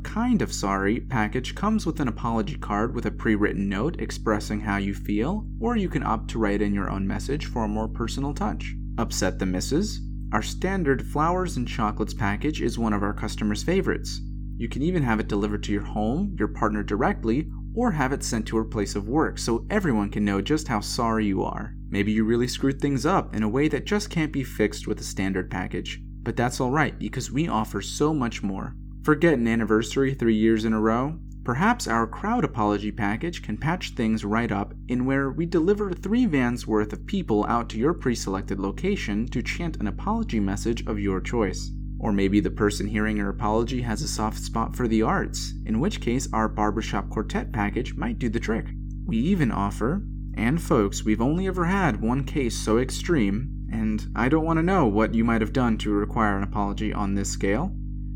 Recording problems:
electrical hum; faint; throughout; 50 Hz, 20 dB below the speech

